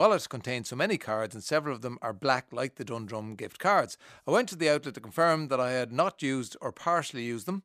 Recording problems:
abrupt cut into speech; at the start

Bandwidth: 14.5 kHz